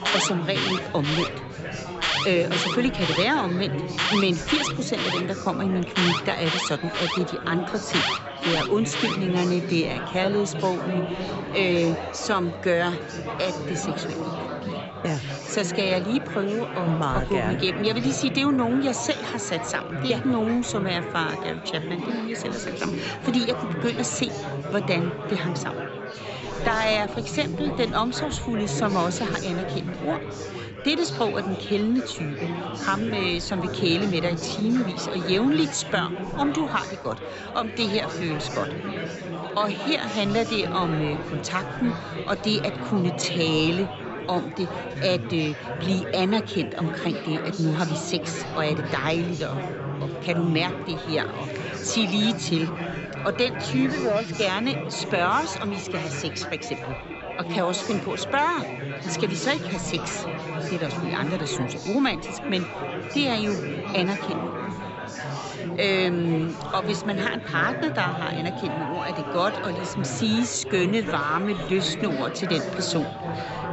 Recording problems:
high frequencies cut off; noticeable; nothing above 7.5 kHz
alarms or sirens; loud; throughout; 8 dB below the speech
chatter from many people; loud; throughout; 6 dB below the speech

